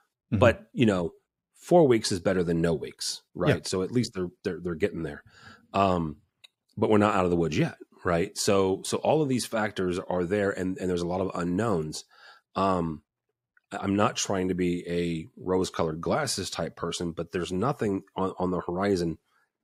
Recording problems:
none

